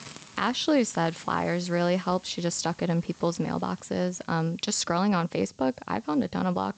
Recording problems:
high frequencies cut off; noticeable; nothing above 8 kHz
hiss; faint; throughout; 25 dB below the speech

